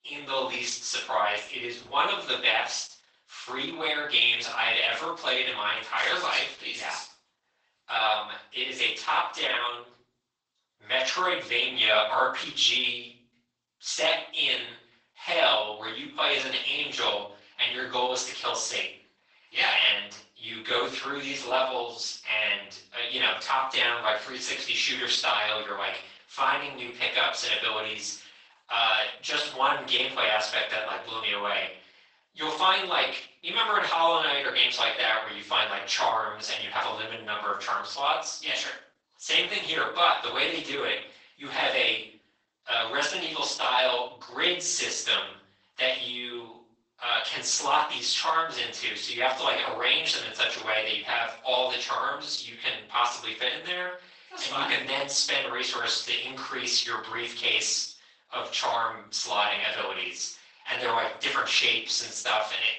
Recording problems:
off-mic speech; far
garbled, watery; badly; nothing above 8 kHz
thin; very; fading below 850 Hz
room echo; noticeable; dies away in 0.4 s

